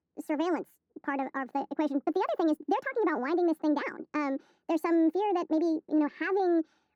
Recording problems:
muffled; very; fading above 2 kHz
wrong speed and pitch; too fast and too high; 1.5 times normal speed

